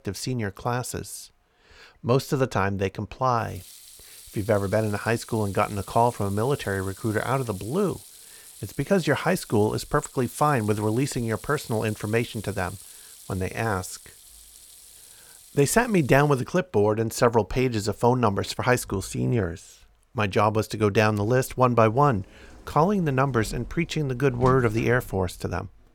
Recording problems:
household noises; noticeable; throughout; 20 dB below the speech

